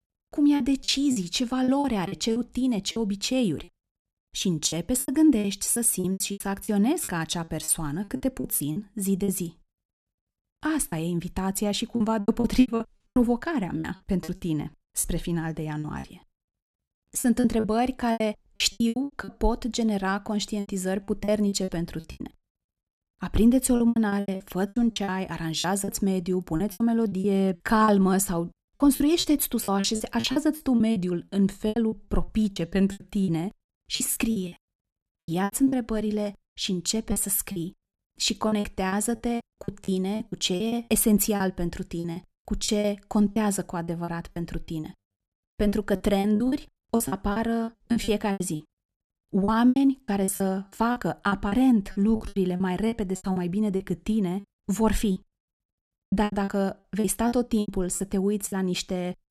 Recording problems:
choppy; very; 15% of the speech affected

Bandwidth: 13.5 kHz